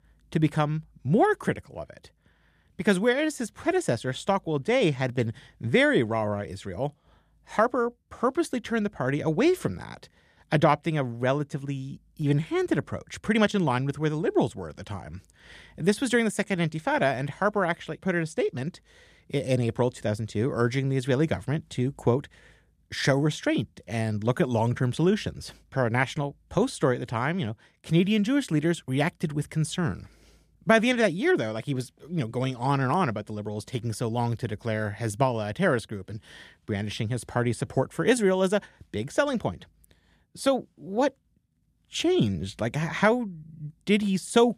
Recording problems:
none

